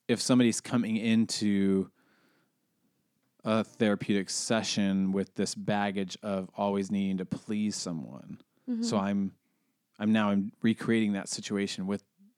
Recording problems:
none

